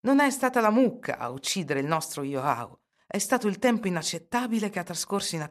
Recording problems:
none

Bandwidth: 13.5 kHz